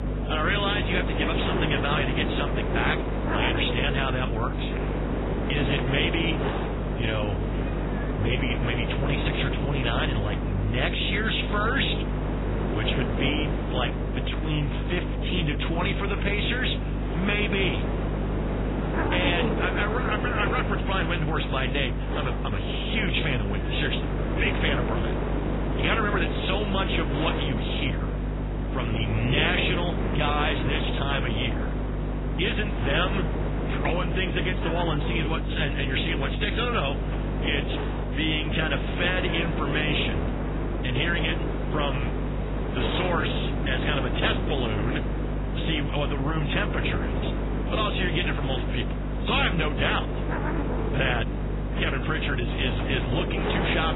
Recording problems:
garbled, watery; badly; nothing above 4 kHz
hiss; loud; throughout; 4 dB below the speech
electrical hum; noticeable; throughout; 50 Hz, 15 dB below the speech

